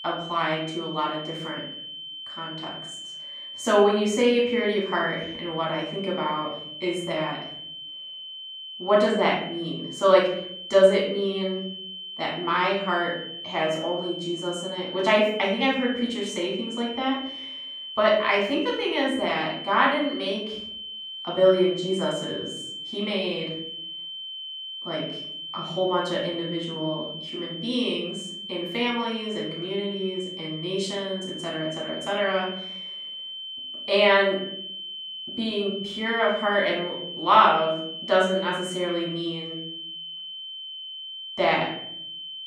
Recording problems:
off-mic speech; far
room echo; noticeable; dies away in 0.7 s
high-pitched whine; loud; throughout; 3 kHz, 9 dB below the speech

